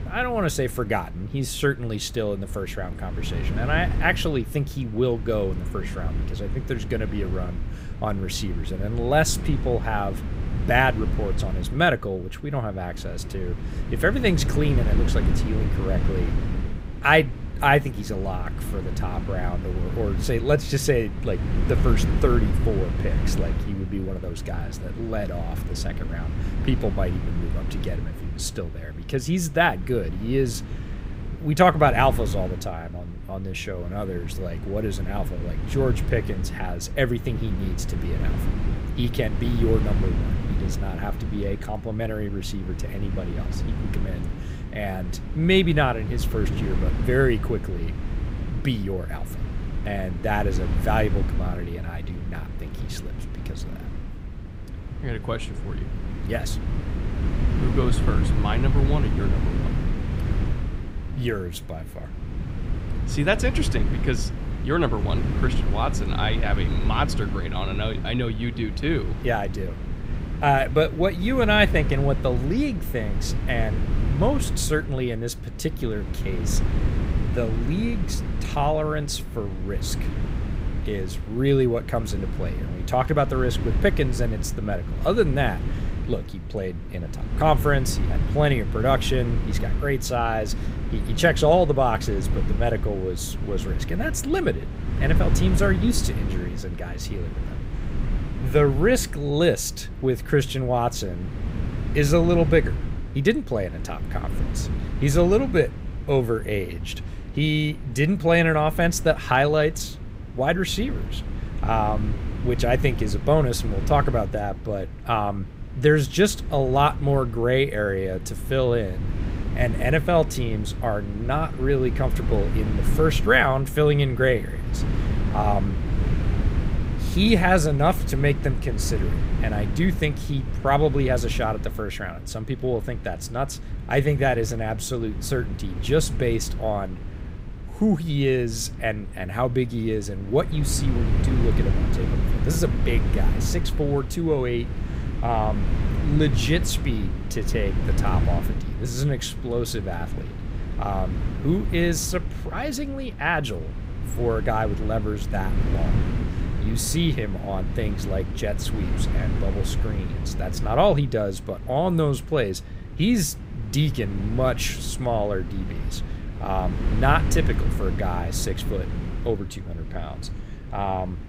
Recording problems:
wind noise on the microphone; occasional gusts; 15 dB below the speech

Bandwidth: 15.5 kHz